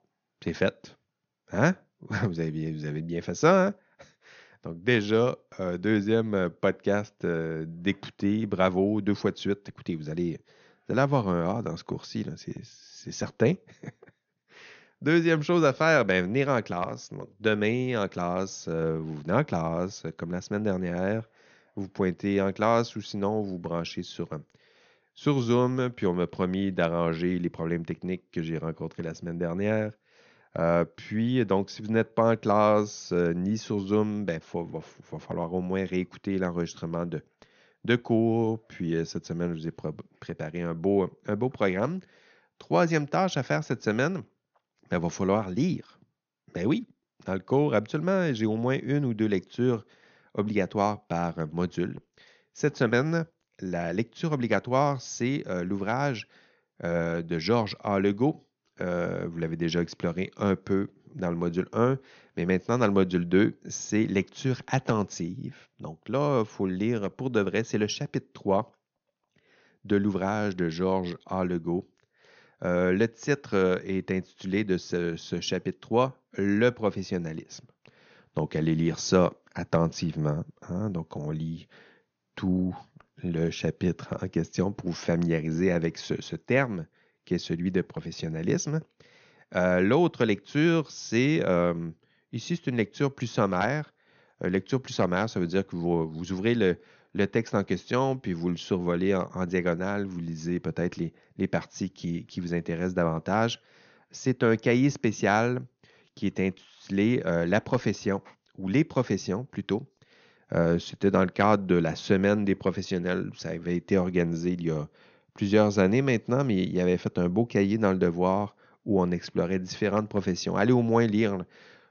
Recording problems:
high frequencies cut off; noticeable; nothing above 6.5 kHz

